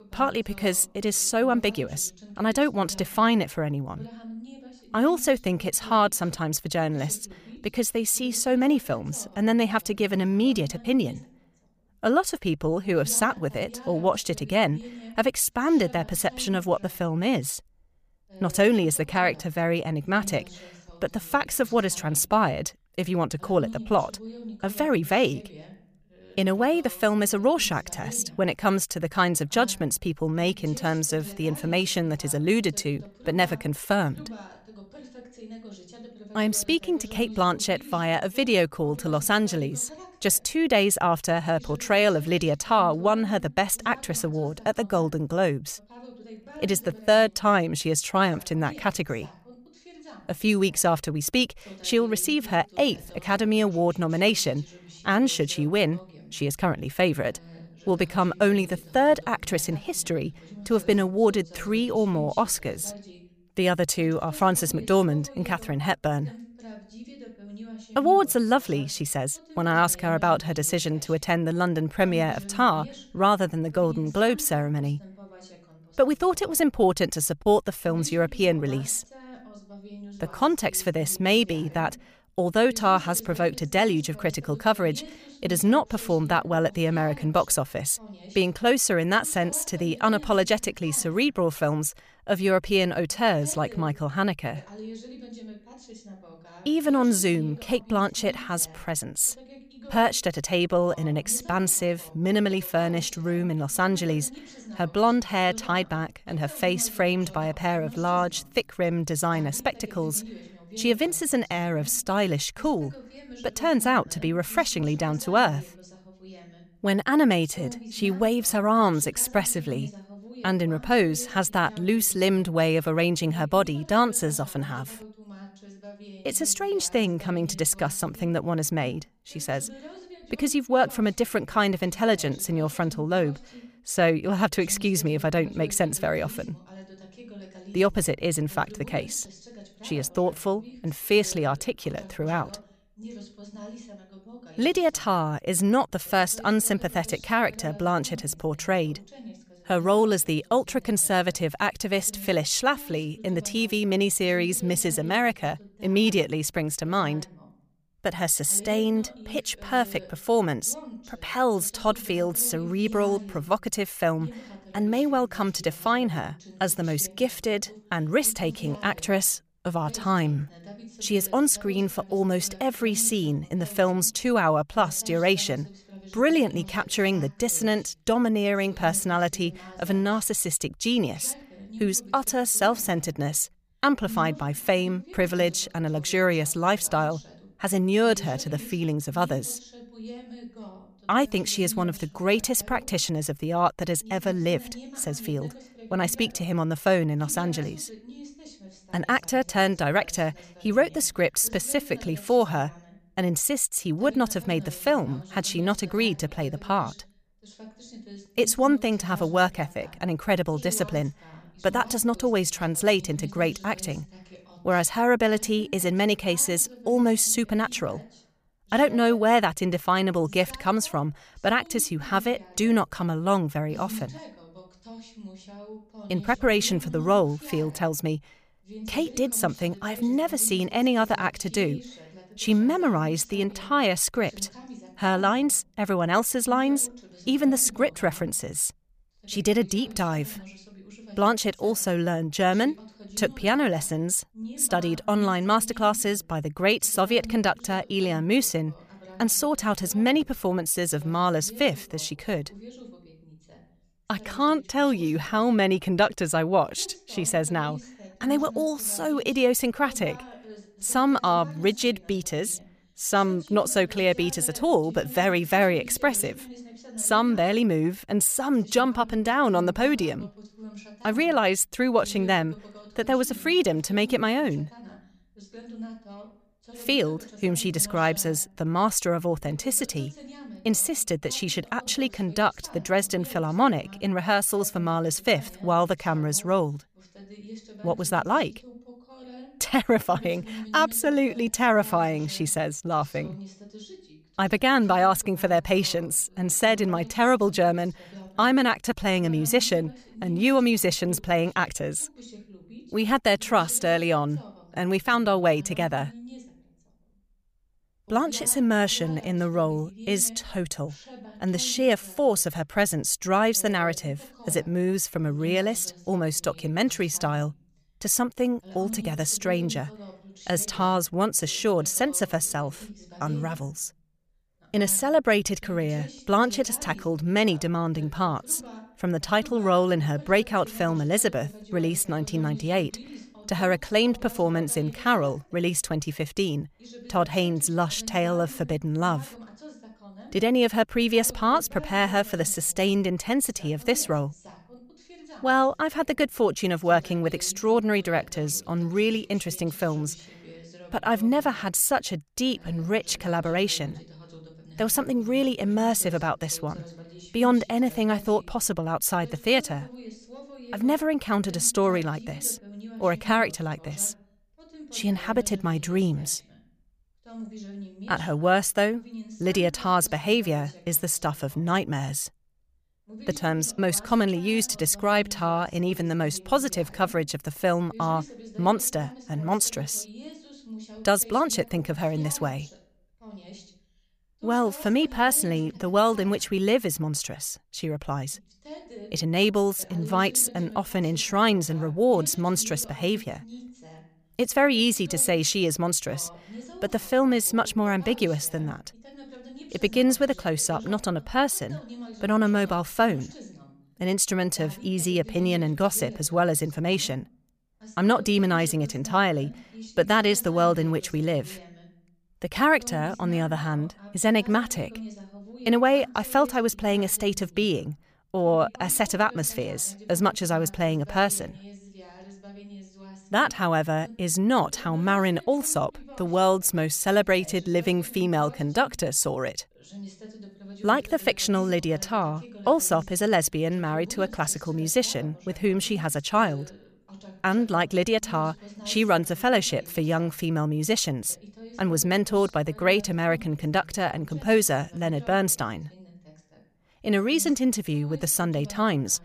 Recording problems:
voice in the background; faint; throughout; 20 dB below the speech

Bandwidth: 15 kHz